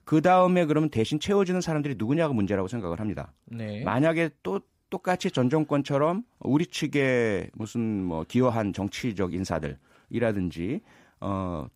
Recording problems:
none

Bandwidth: 15.5 kHz